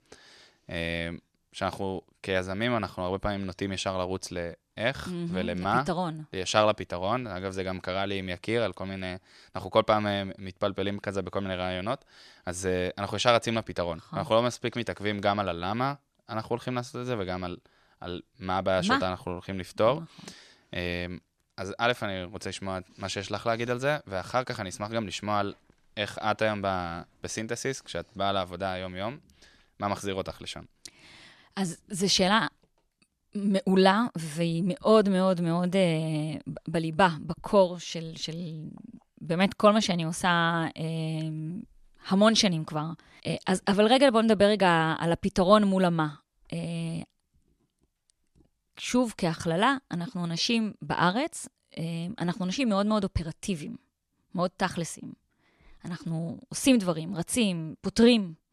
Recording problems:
none

